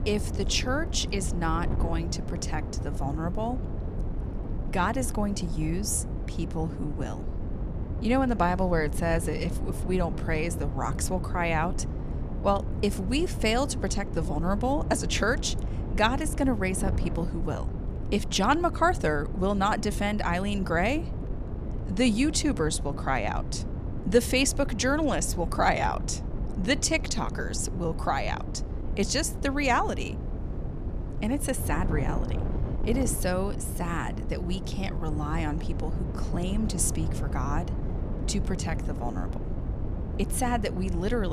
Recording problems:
wind noise on the microphone; occasional gusts; 15 dB below the speech
abrupt cut into speech; at the end

